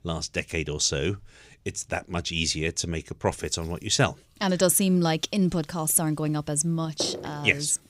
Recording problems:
household noises; noticeable; throughout; 15 dB below the speech

